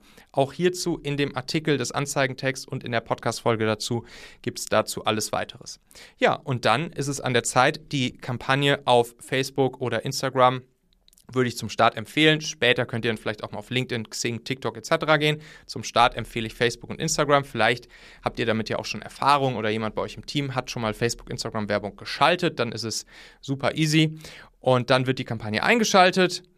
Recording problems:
none

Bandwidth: 14.5 kHz